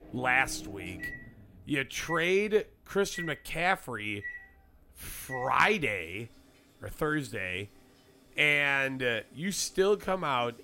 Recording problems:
household noises; noticeable; throughout; 15 dB below the speech

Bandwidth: 16 kHz